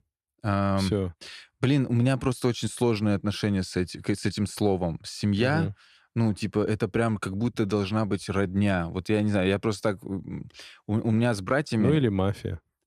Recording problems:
none

